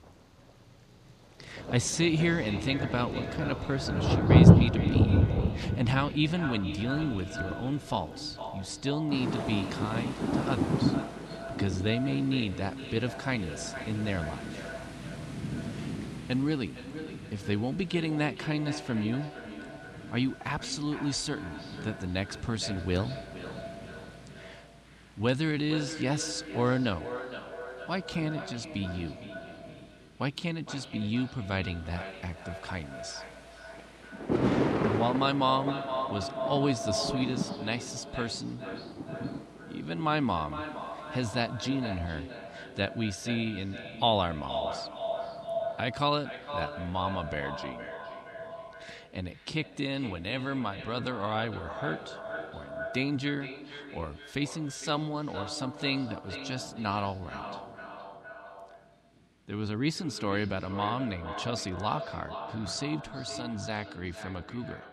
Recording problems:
echo of what is said; strong; throughout; 460 ms later, 9 dB below the speech
rain or running water; very loud; throughout; 2 dB above the speech

